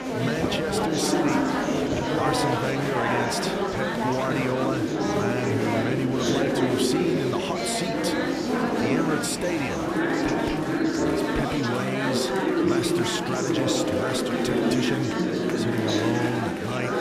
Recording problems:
chatter from many people; very loud; throughout; 5 dB above the speech

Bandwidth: 14.5 kHz